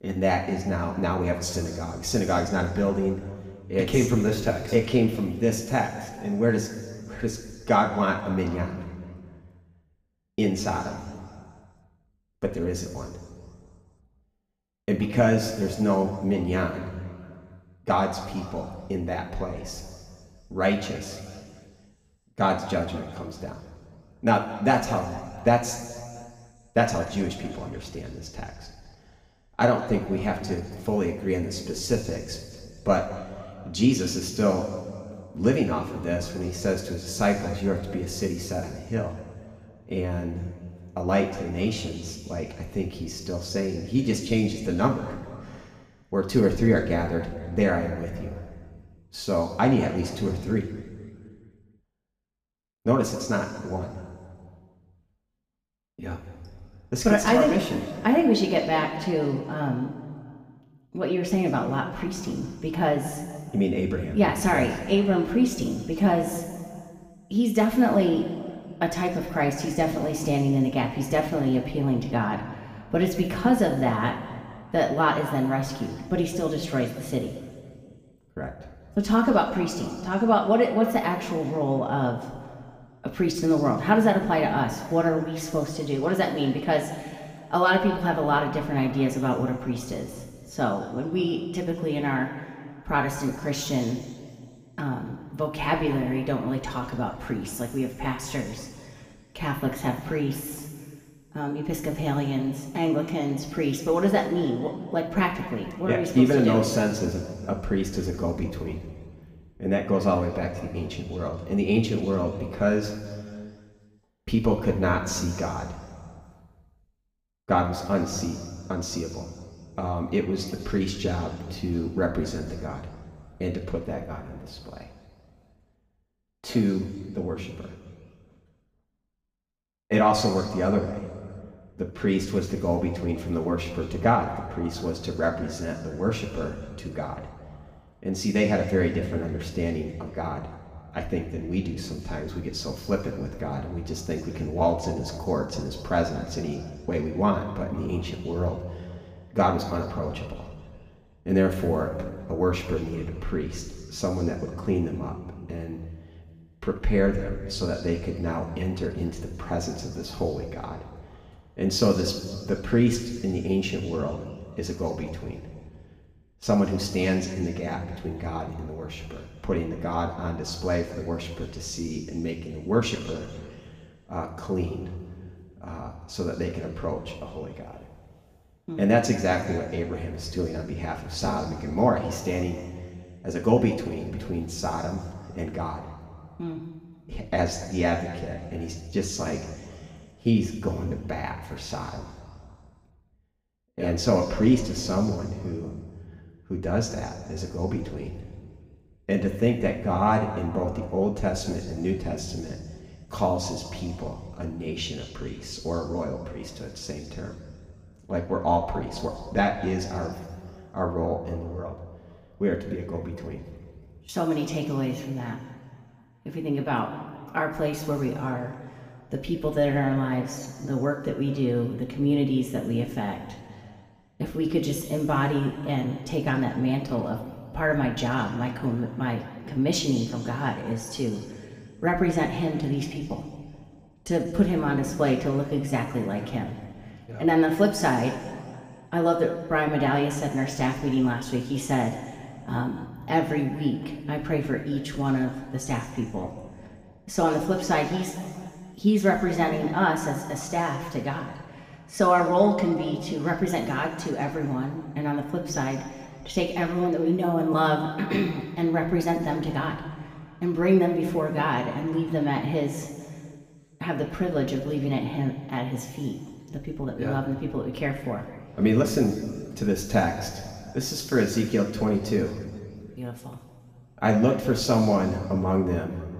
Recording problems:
room echo; noticeable; dies away in 1.8 s
off-mic speech; somewhat distant

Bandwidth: 15 kHz